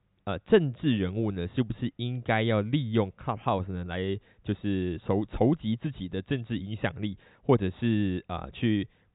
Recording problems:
high frequencies cut off; severe; nothing above 4 kHz

